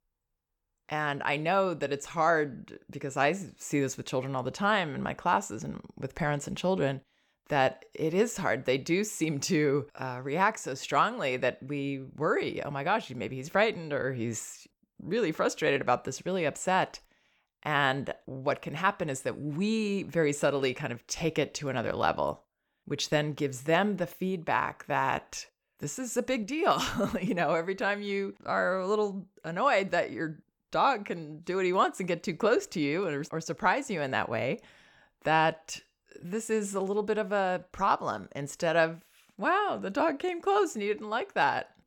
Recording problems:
none

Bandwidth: 18 kHz